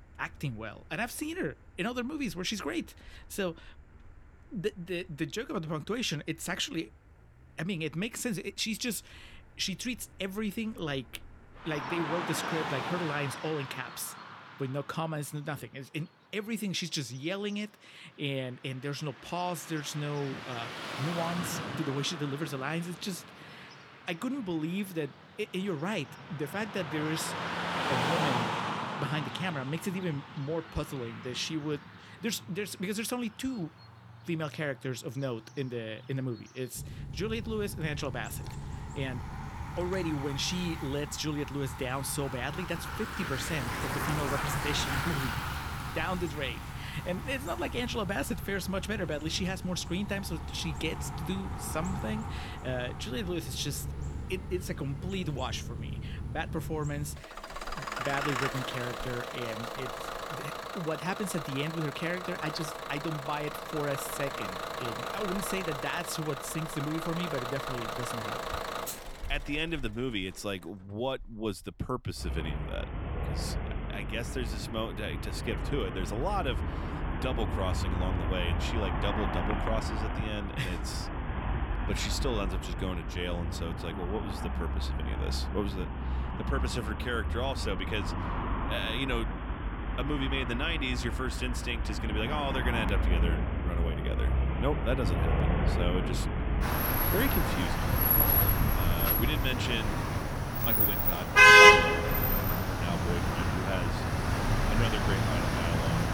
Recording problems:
traffic noise; very loud; throughout; 4 dB above the speech

